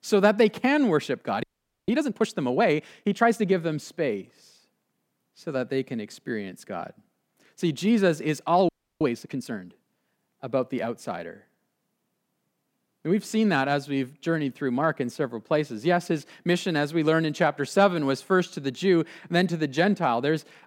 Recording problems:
audio freezing; at 1.5 s and at 8.5 s

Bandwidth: 16.5 kHz